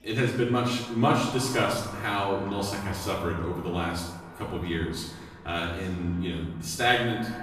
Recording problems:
off-mic speech; far
echo of what is said; noticeable; throughout; 130 ms later, 15 dB below the speech
room echo; noticeable; dies away in 0.8 s
murmuring crowd; faint; throughout; 25 dB below the speech

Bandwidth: 14.5 kHz